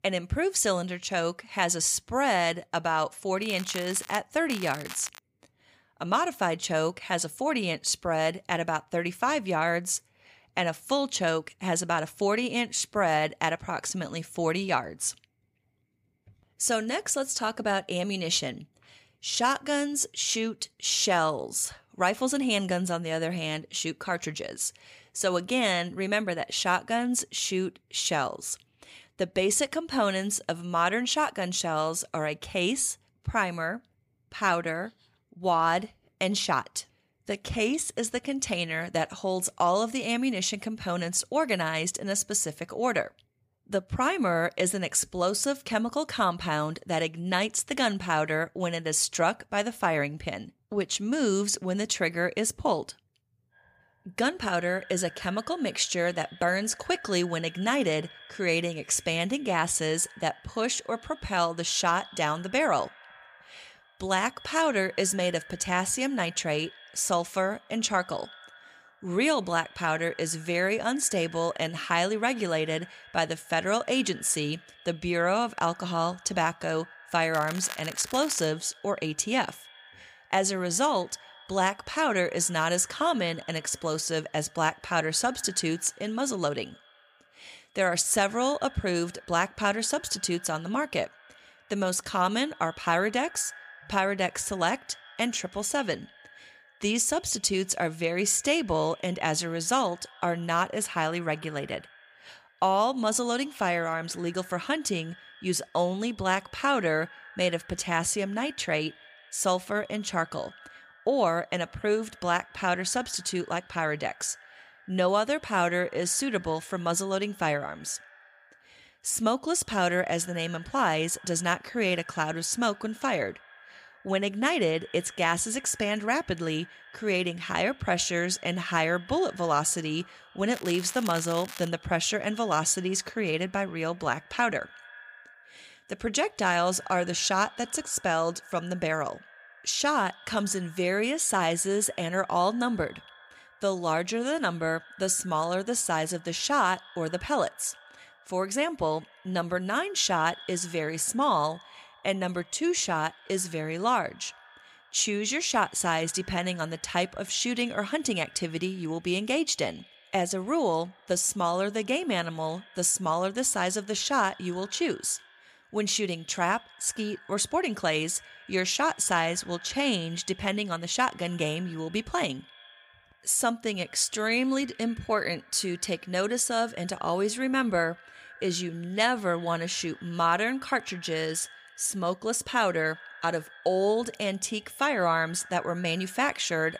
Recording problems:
echo of what is said; faint; from 53 s on; 90 ms later, 20 dB below the speech
crackling; noticeable; 4 times, first at 3.5 s; 15 dB below the speech

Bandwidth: 15 kHz